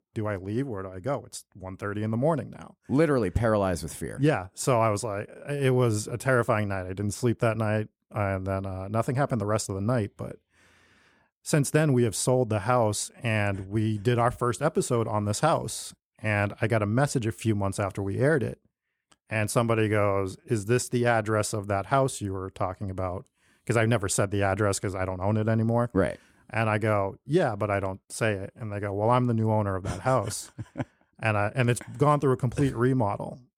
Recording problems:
none

